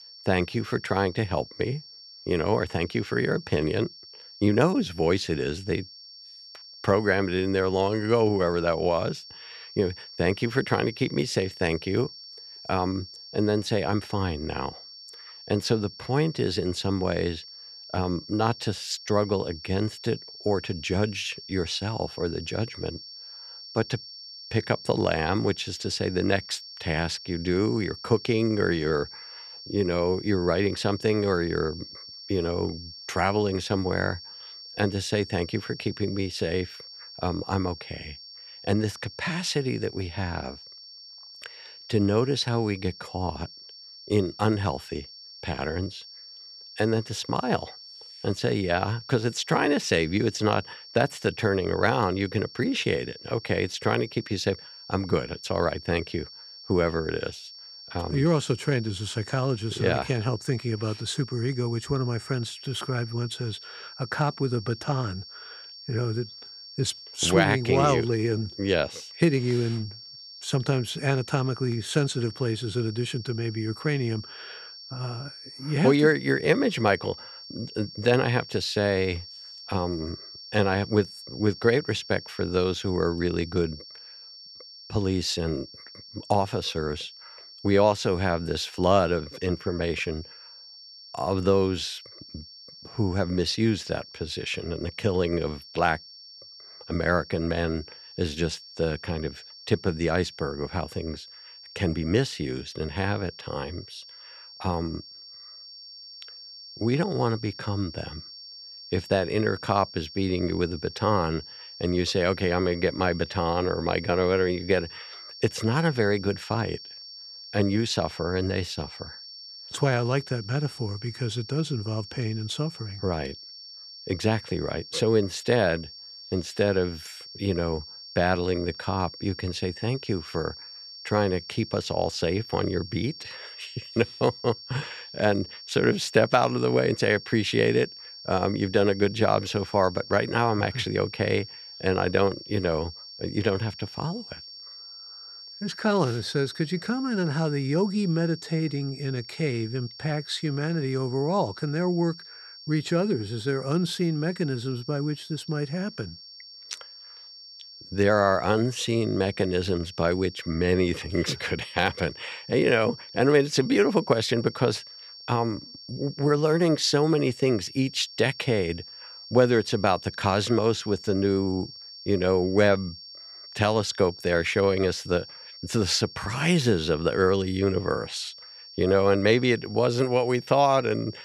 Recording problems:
high-pitched whine; noticeable; throughout; 5.5 kHz, 15 dB below the speech

